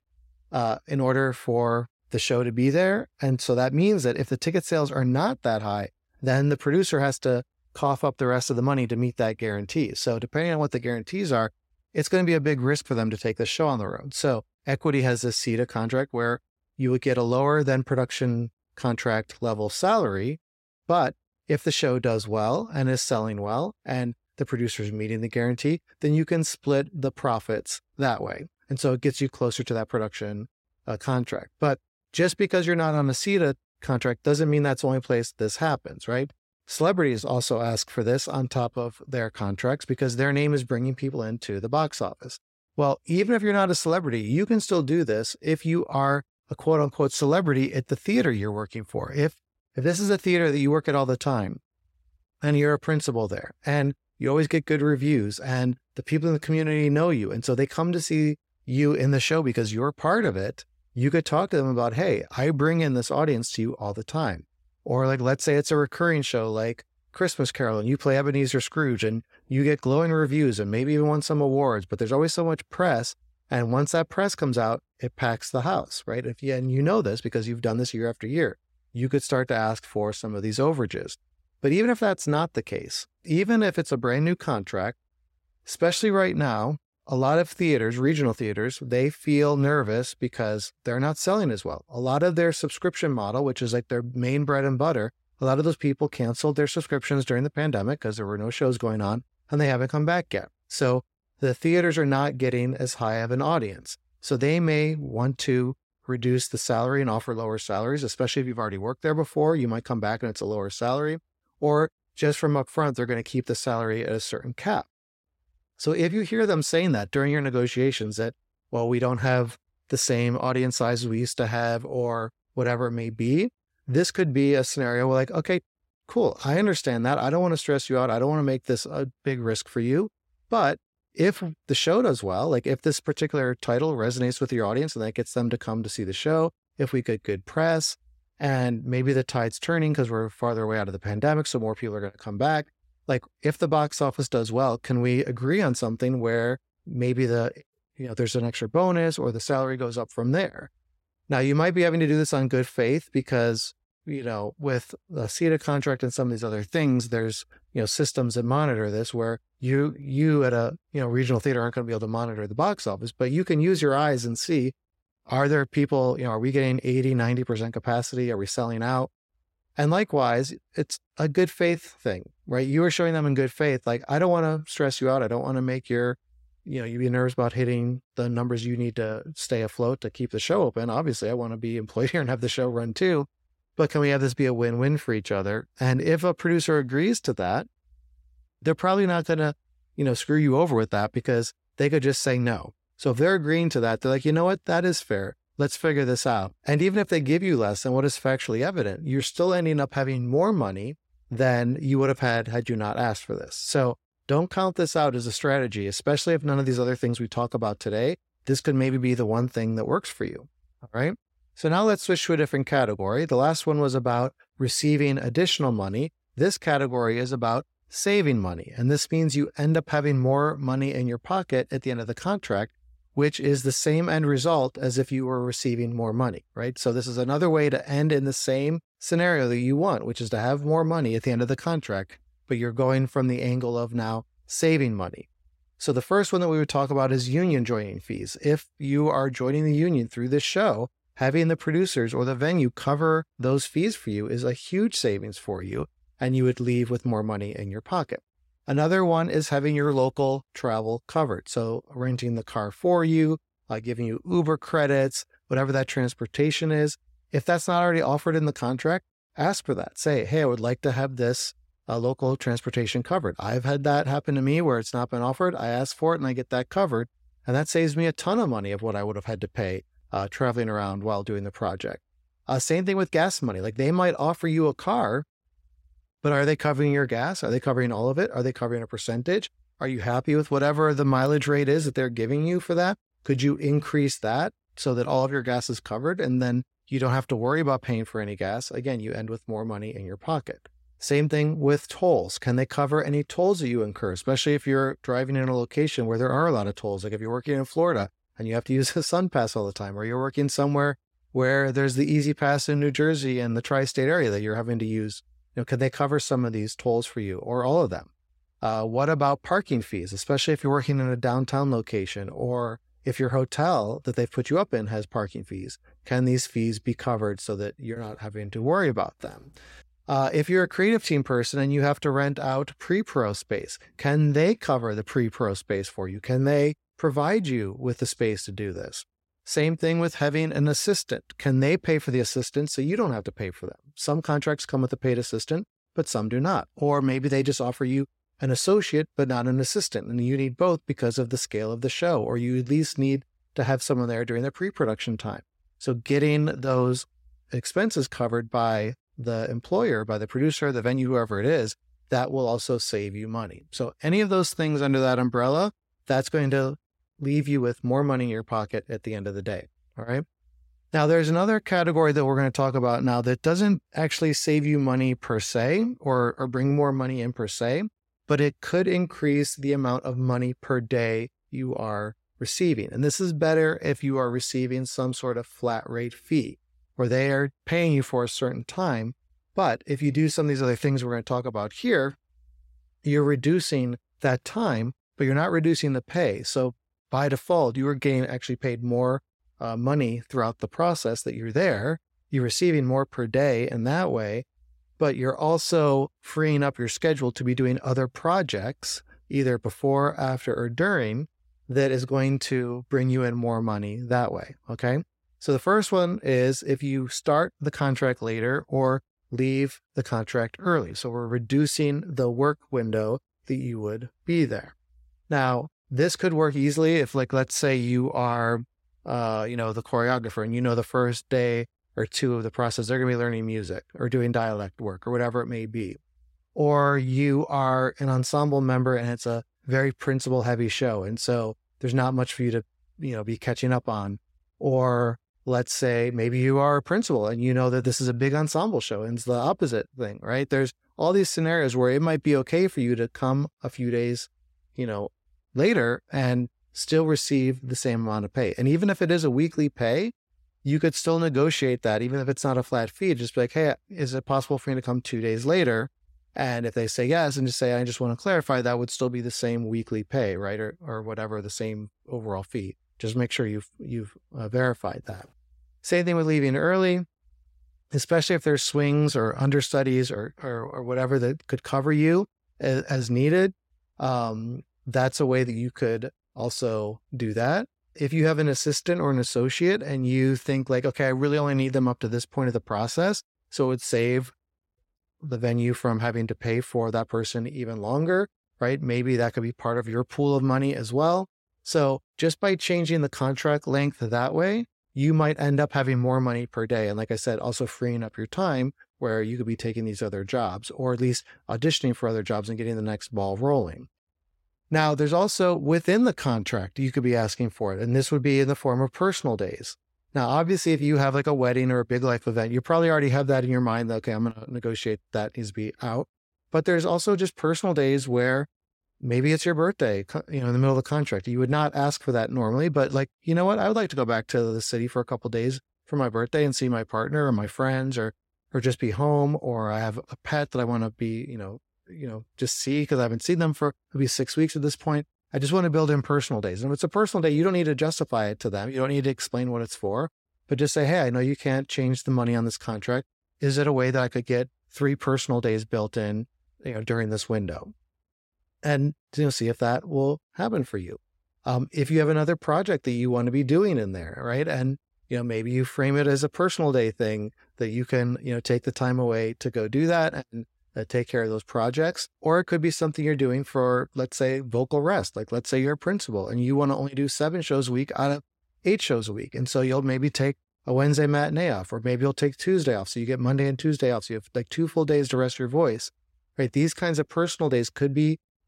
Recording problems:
none

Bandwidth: 16 kHz